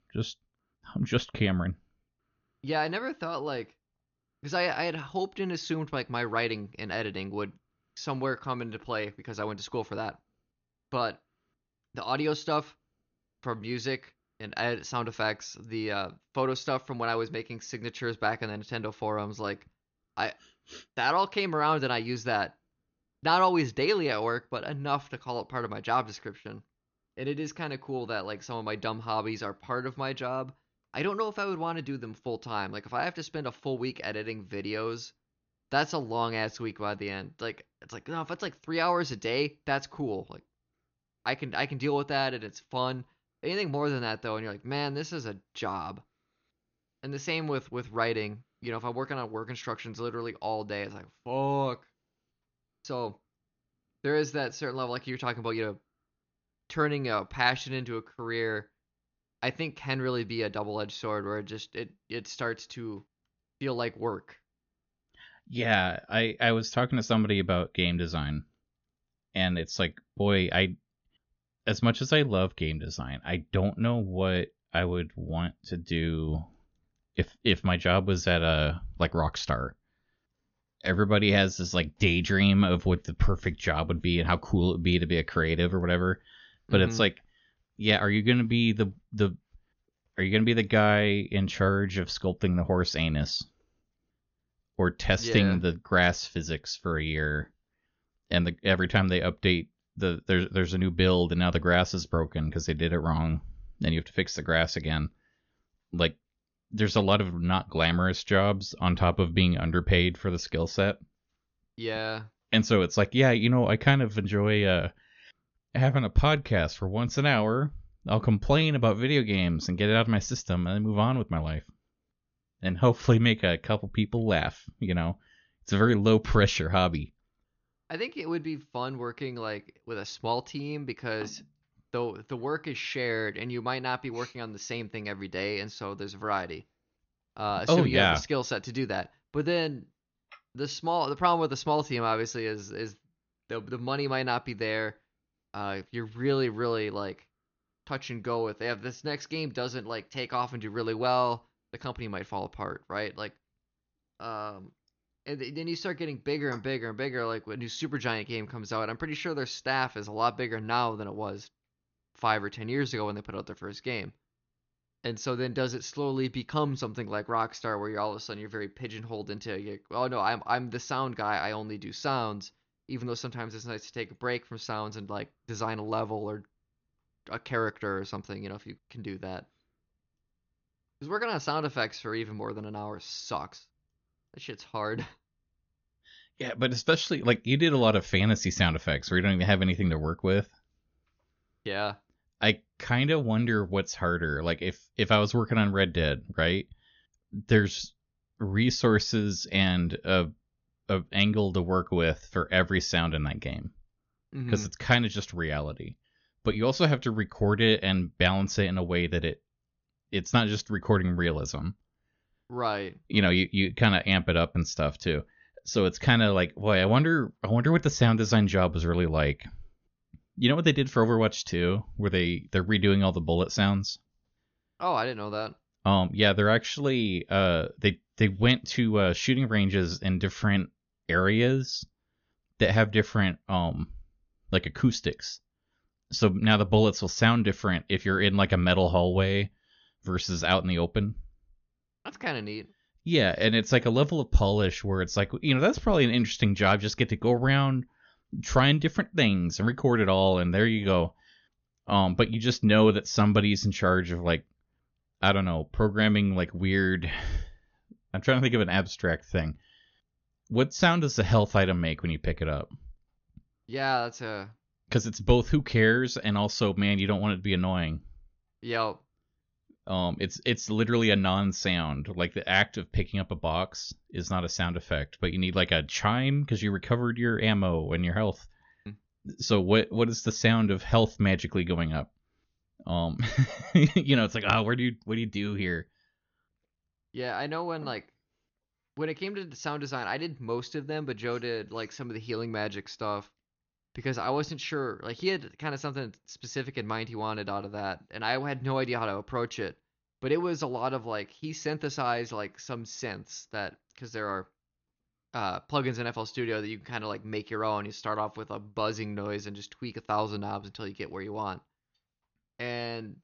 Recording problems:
high frequencies cut off; noticeable; nothing above 6.5 kHz

